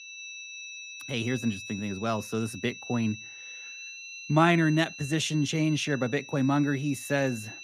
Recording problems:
high-pitched whine; noticeable; throughout; 2.5 kHz, 15 dB below the speech

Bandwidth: 15 kHz